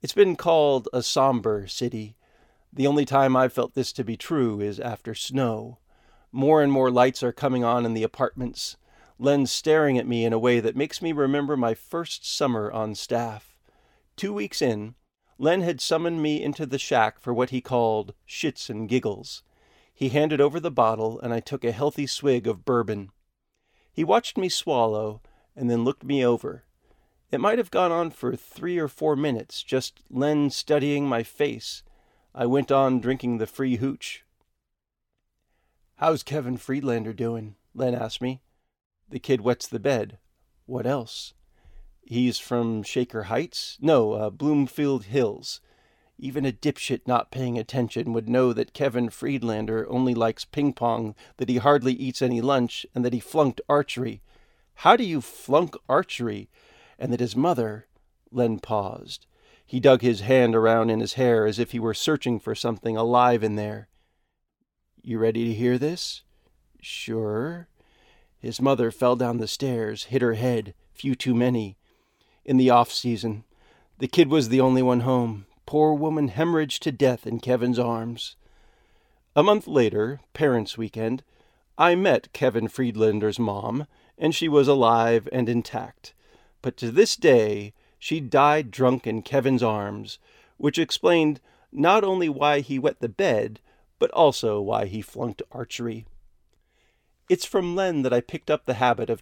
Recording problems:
none

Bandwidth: 17.5 kHz